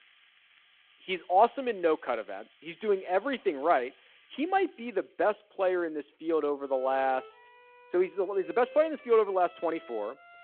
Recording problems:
phone-call audio
background music; faint; throughout; 25 dB below the speech

